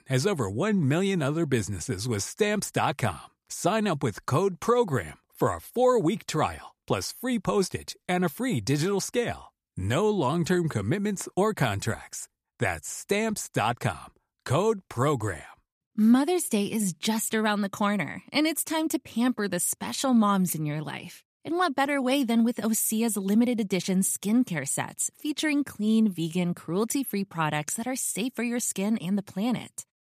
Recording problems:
none

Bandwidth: 14.5 kHz